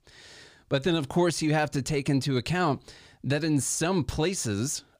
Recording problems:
none

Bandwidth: 15 kHz